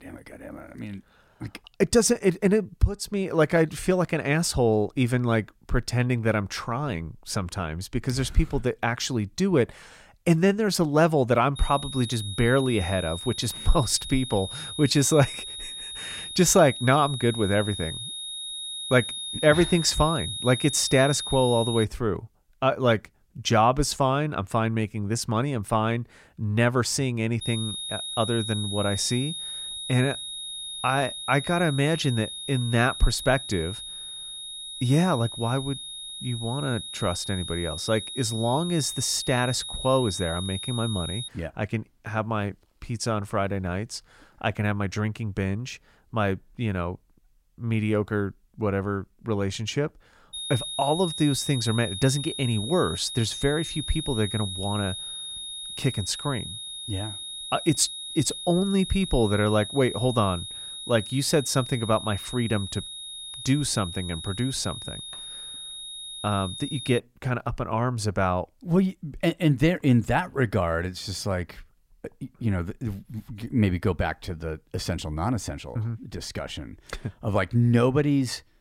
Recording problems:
high-pitched whine; loud; from 12 to 22 s, from 27 to 41 s and from 50 s to 1:07; 3.5 kHz, 8 dB below the speech

